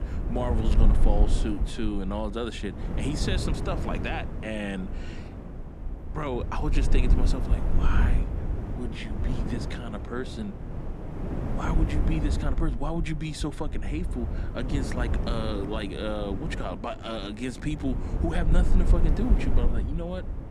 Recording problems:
wind noise on the microphone; heavy; 6 dB below the speech

